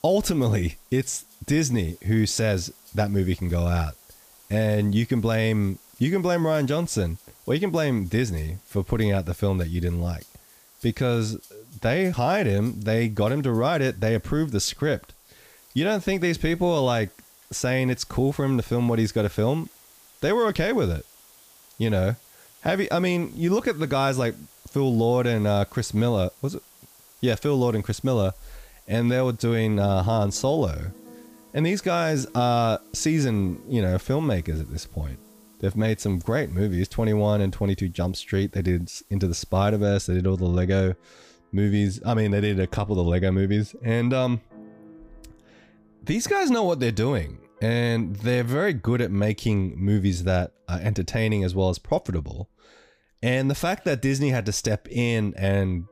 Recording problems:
background music; faint; throughout; 30 dB below the speech
hiss; faint; until 40 s; 25 dB below the speech

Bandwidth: 15 kHz